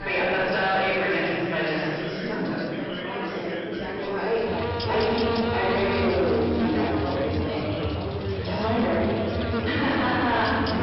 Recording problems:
room echo; strong; dies away in 2 s
off-mic speech; far
high frequencies cut off; noticeable; nothing above 5.5 kHz
distortion; slight; 10 dB below the speech
electrical hum; loud; from 4.5 s on; 50 Hz, 5 dB below the speech
chatter from many people; loud; throughout; 7 dB below the speech

